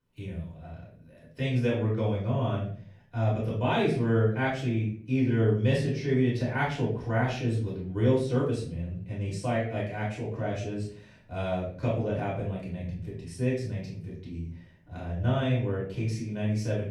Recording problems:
off-mic speech; far
room echo; noticeable; dies away in 0.4 s

